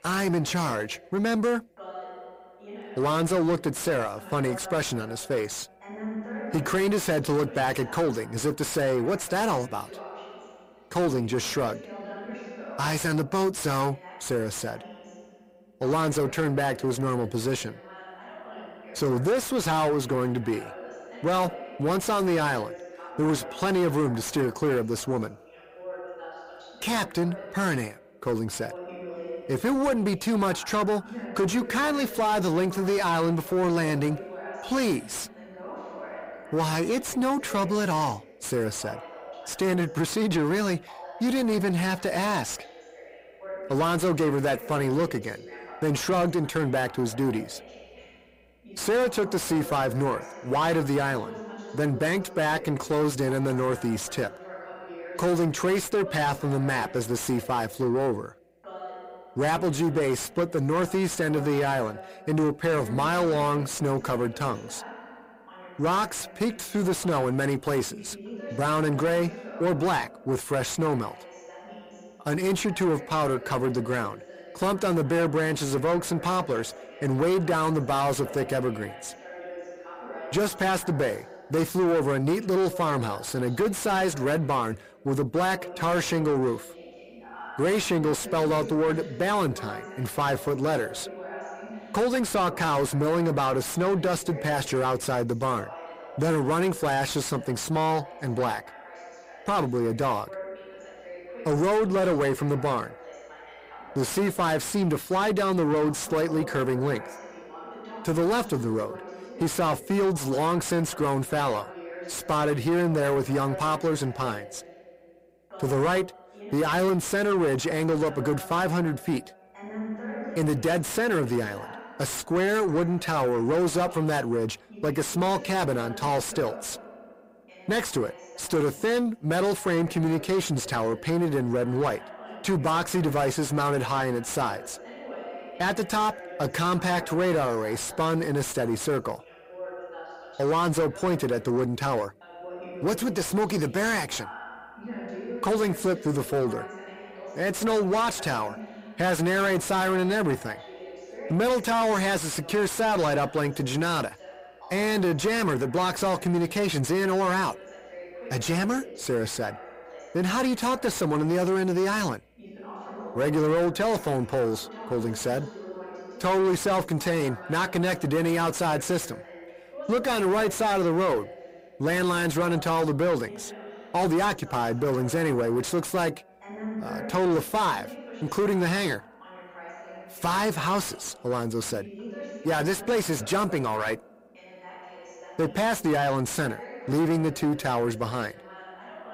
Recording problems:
distortion; heavy; 6 dB below the speech
voice in the background; noticeable; throughout; 15 dB below the speech

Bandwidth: 15.5 kHz